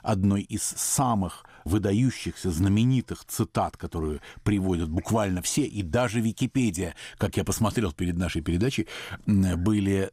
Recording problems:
none

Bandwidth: 15.5 kHz